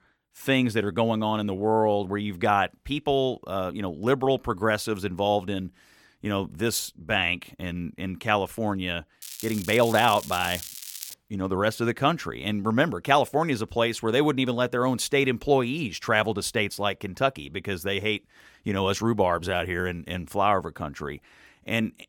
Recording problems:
crackling; noticeable; from 9 to 11 s; 10 dB below the speech

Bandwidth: 17 kHz